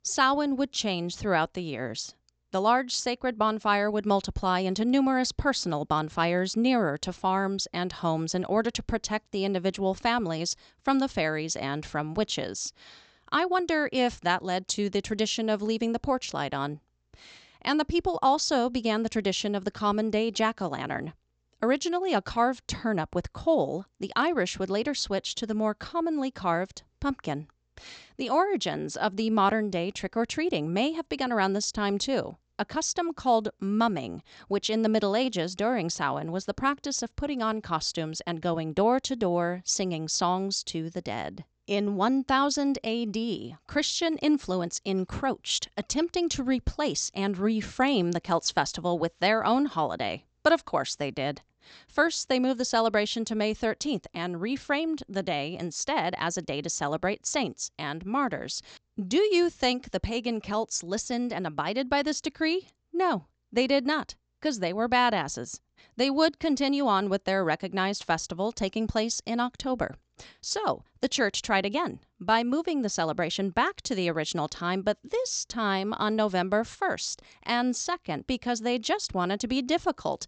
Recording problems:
high frequencies cut off; noticeable; nothing above 8 kHz

